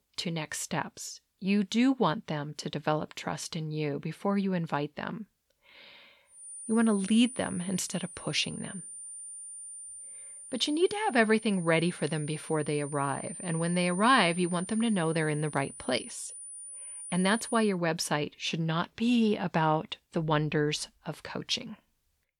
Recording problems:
high-pitched whine; noticeable; from 6.5 to 18 s; 9 kHz, 10 dB below the speech

